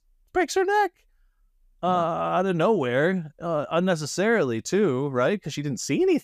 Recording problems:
none

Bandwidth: 15 kHz